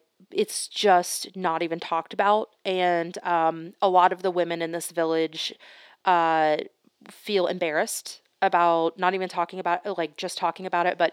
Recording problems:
thin; somewhat; fading below 350 Hz

